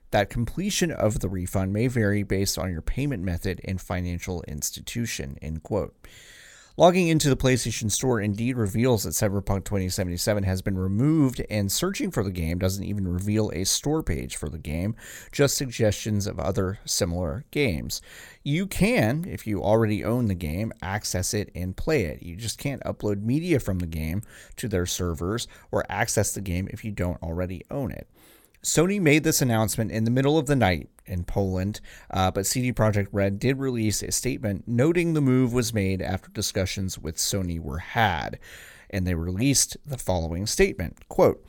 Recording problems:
none

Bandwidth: 17 kHz